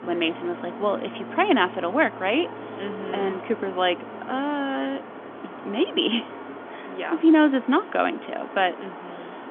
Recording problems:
phone-call audio; nothing above 3.5 kHz
train or aircraft noise; noticeable; throughout; 15 dB below the speech

